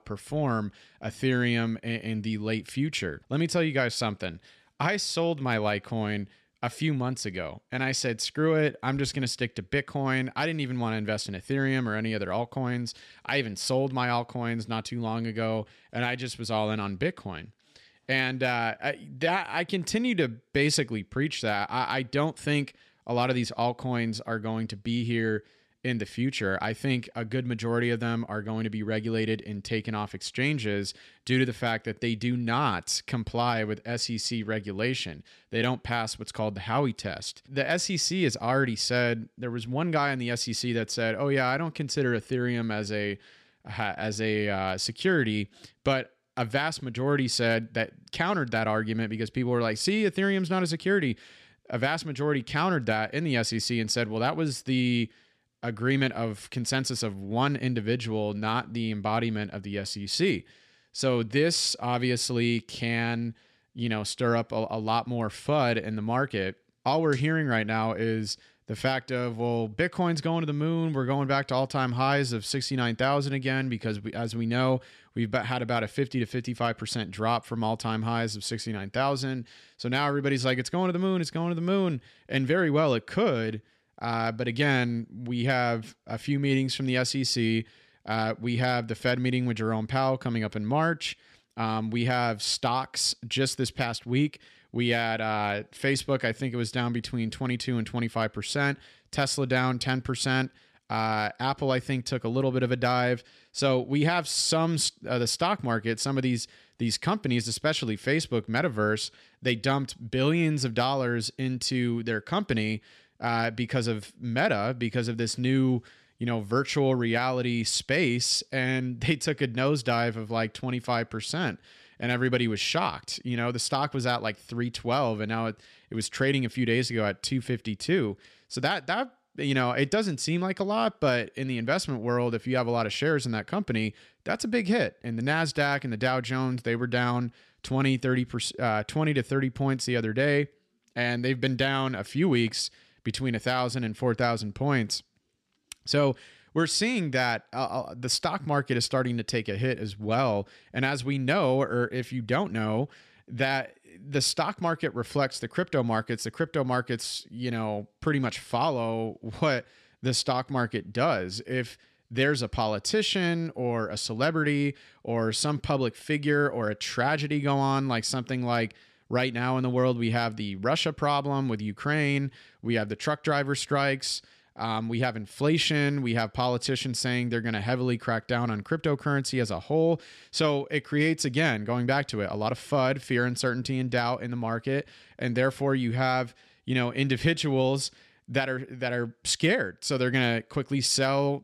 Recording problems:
none

